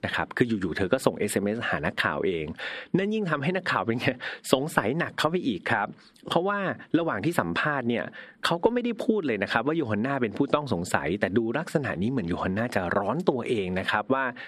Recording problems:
squashed, flat; somewhat

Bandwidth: 13.5 kHz